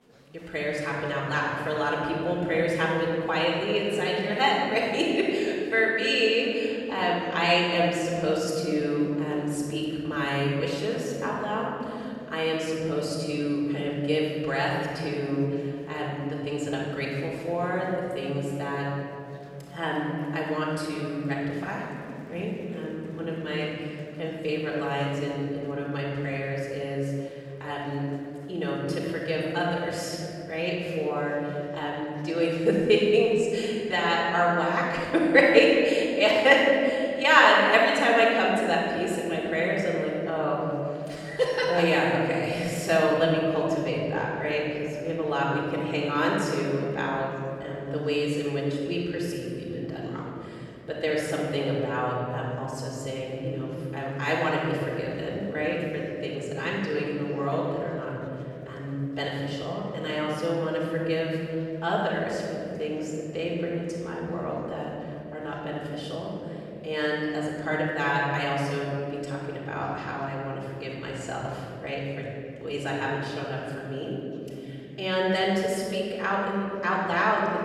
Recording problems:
room echo; strong; dies away in 3 s
off-mic speech; far
chatter from many people; faint; throughout; 30 dB below the speech

